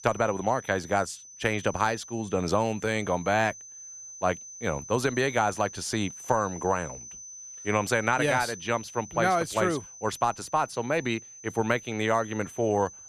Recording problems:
high-pitched whine; noticeable; throughout; 6 kHz, 15 dB below the speech

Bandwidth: 14.5 kHz